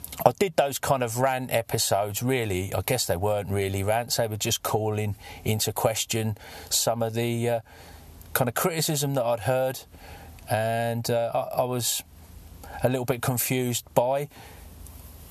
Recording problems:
squashed, flat; somewhat

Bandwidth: 13.5 kHz